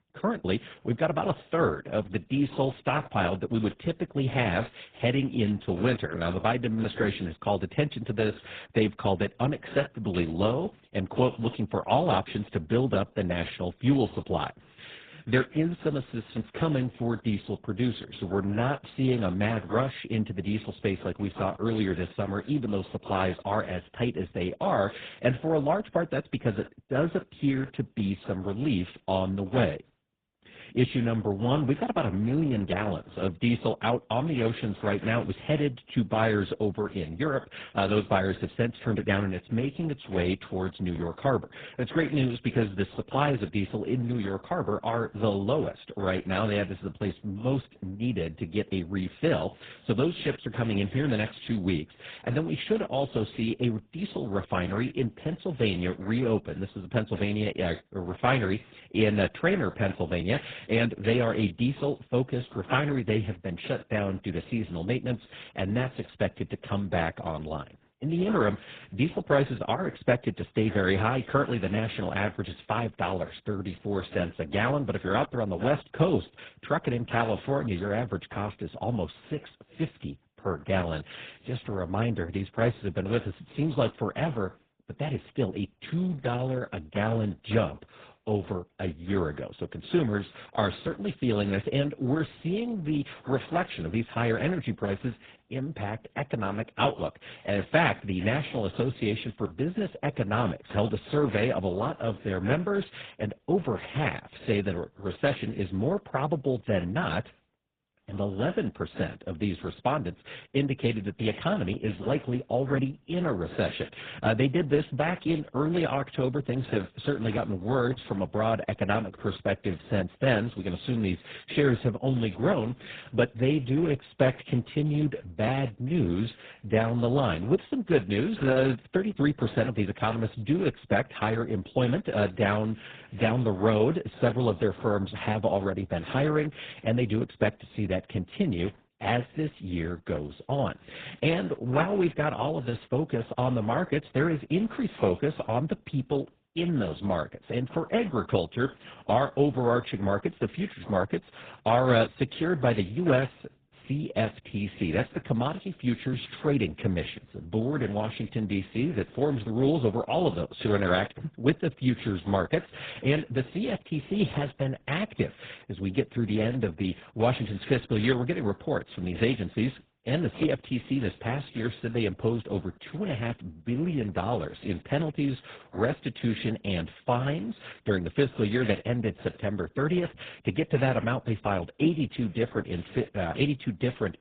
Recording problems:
garbled, watery; badly; nothing above 4 kHz

